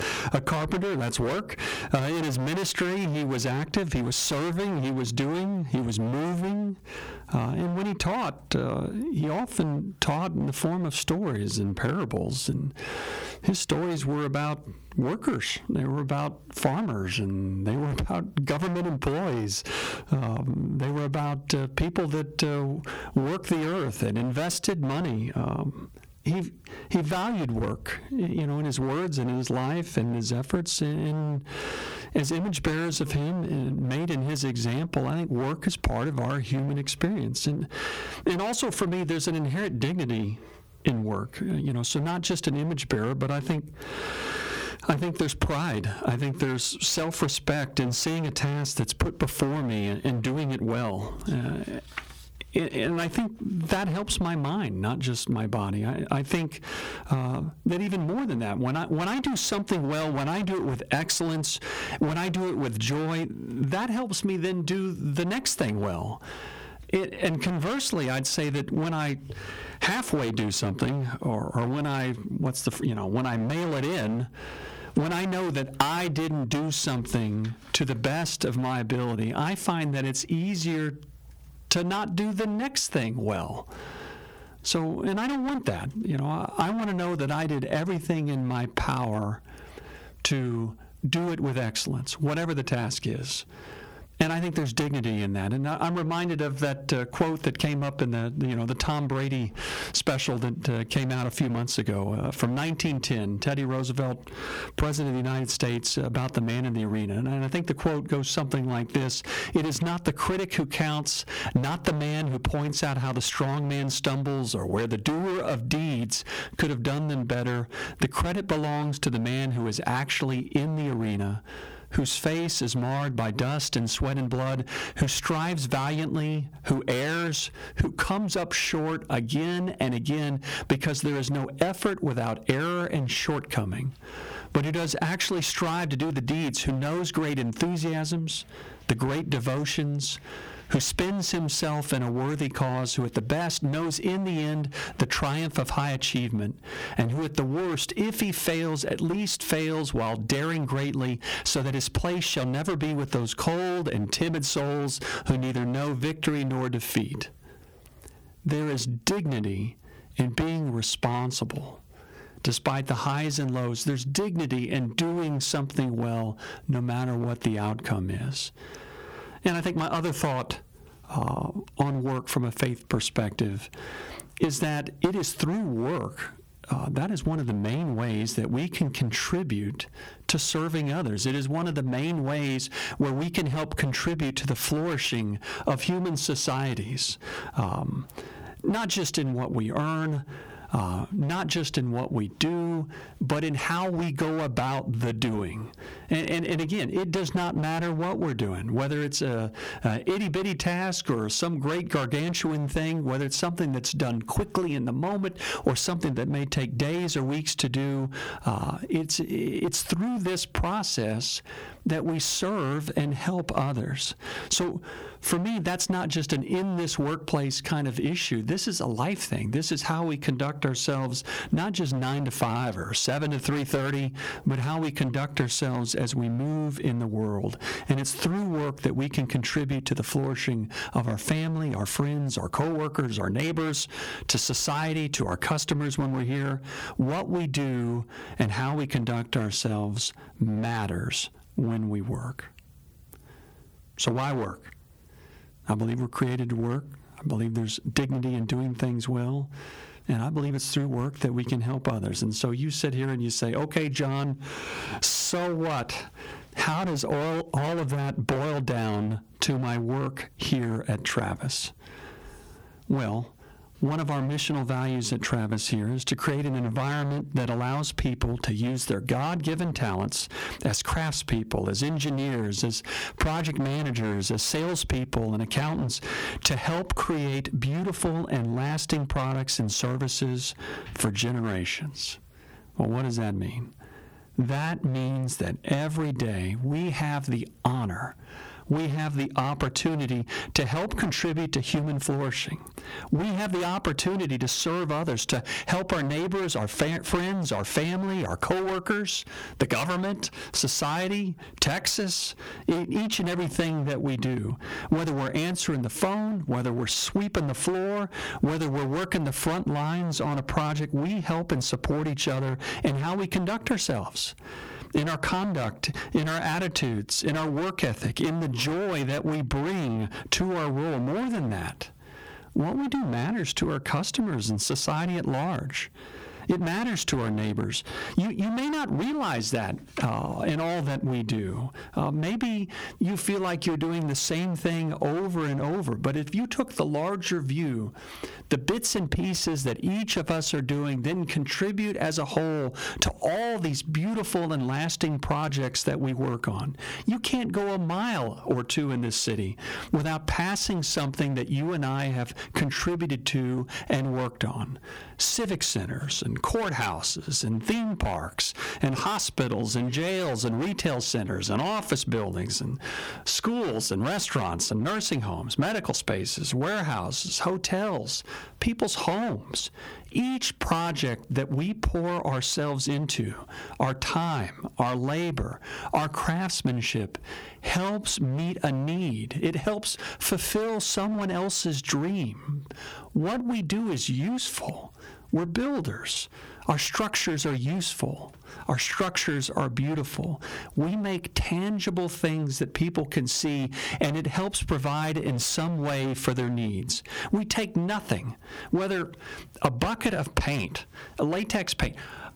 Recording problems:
distortion; heavy; 18% of the sound clipped
squashed, flat; somewhat

